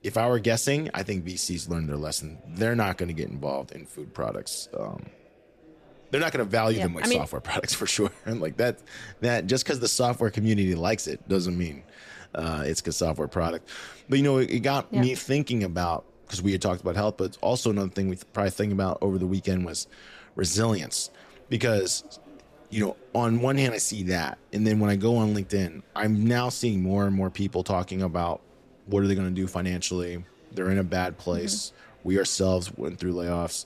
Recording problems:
murmuring crowd; faint; throughout; 30 dB below the speech

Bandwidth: 14.5 kHz